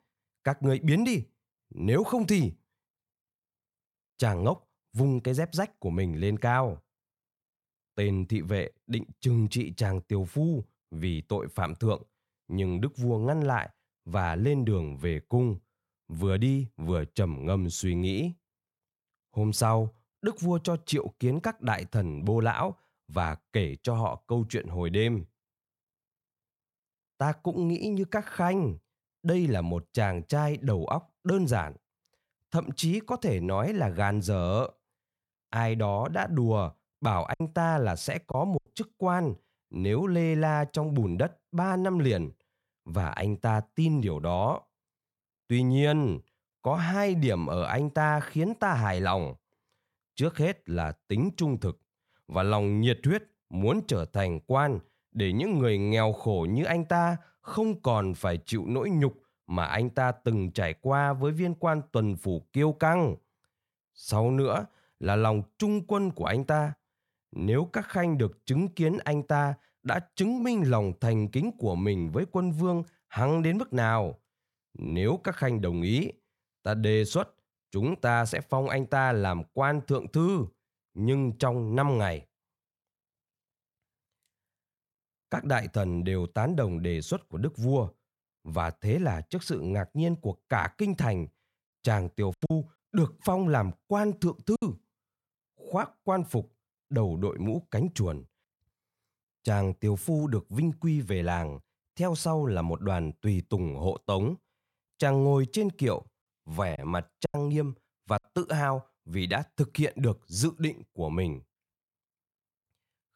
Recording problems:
choppy; very; from 37 to 39 s, from 1:32 to 1:35 and at 1:47; 8% of the speech affected

